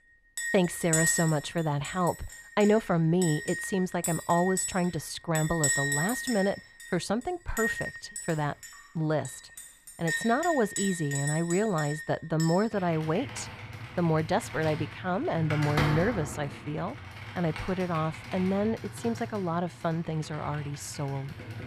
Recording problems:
muffled; slightly; fading above 4 kHz
household noises; loud; throughout; 5 dB below the speech

